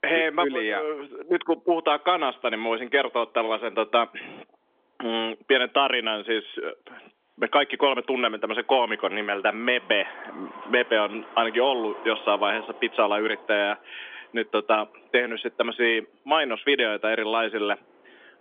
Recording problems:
phone-call audio; nothing above 3.5 kHz
wind in the background; faint; throughout; 20 dB below the speech

